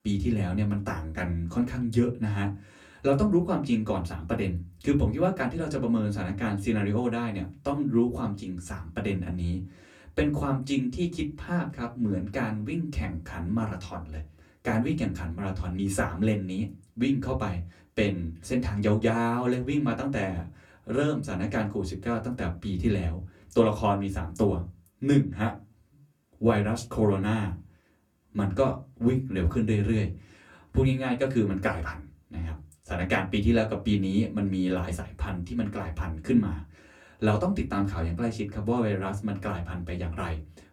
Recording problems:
off-mic speech; far
room echo; very slight; dies away in 0.2 s

